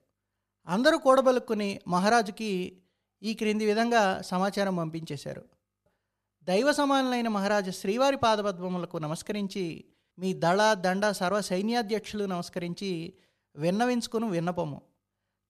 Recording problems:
none

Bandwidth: 14 kHz